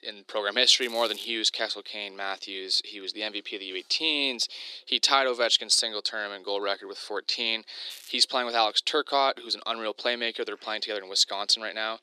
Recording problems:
thin; very; fading below 300 Hz
crackling; faint; at 1 s and at 8 s; 20 dB below the speech

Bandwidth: 14 kHz